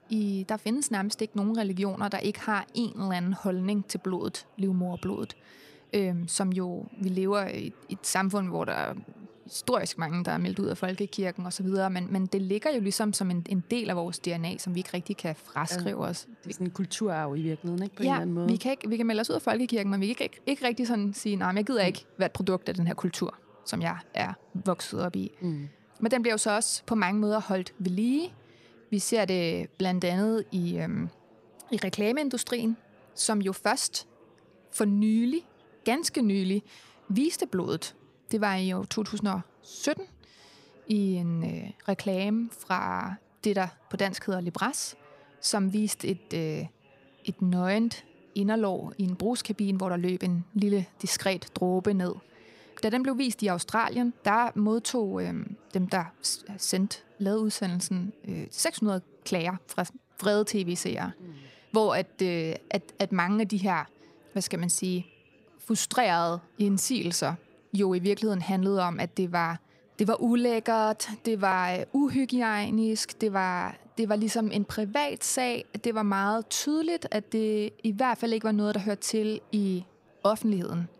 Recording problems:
chatter from many people; faint; throughout; 30 dB below the speech

